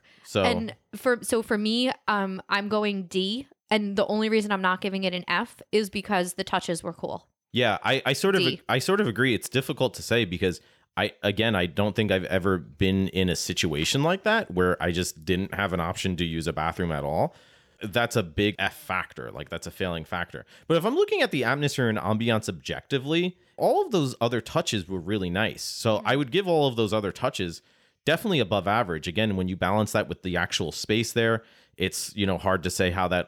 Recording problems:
none

